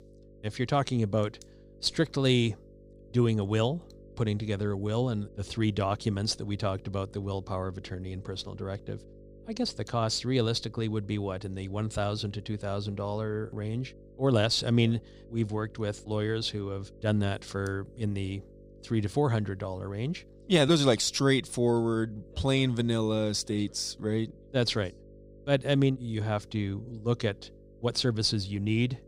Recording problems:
electrical hum; faint; throughout; 50 Hz, 25 dB below the speech

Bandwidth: 15.5 kHz